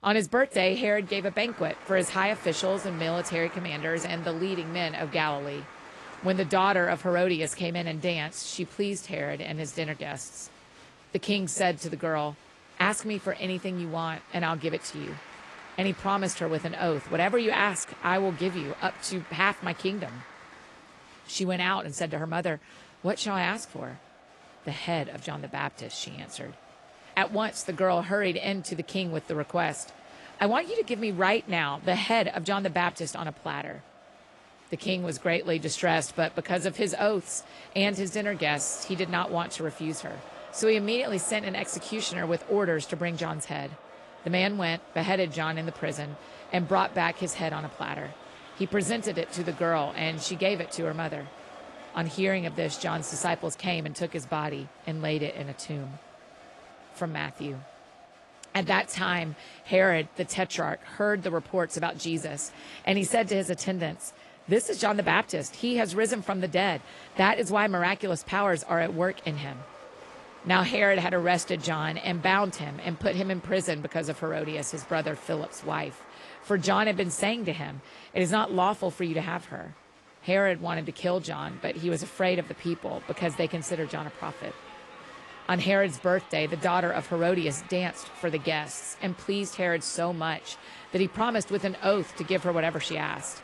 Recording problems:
garbled, watery; slightly
crowd noise; noticeable; throughout; 20 dB below the speech

